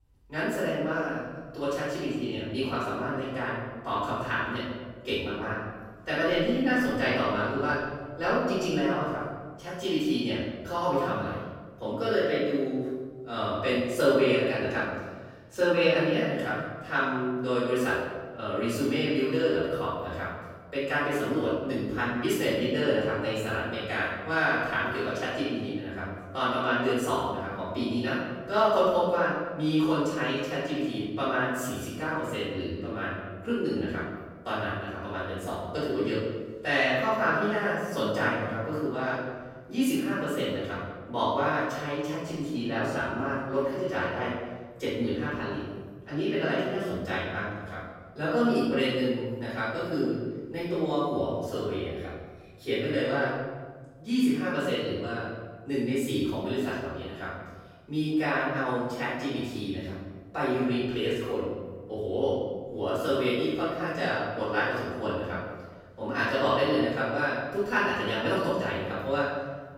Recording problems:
room echo; strong; dies away in 1.4 s
off-mic speech; far

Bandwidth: 16 kHz